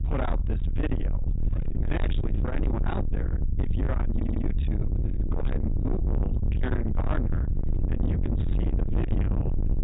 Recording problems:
distortion; heavy; 6 dB below the speech
high frequencies cut off; severe; nothing above 4 kHz
electrical hum; loud; from 1.5 to 3.5 s, from 5 to 6.5 s and from 7.5 s on; 50 Hz, 7 dB below the speech
low rumble; loud; throughout; 4 dB below the speech
audio stuttering; at 4 s

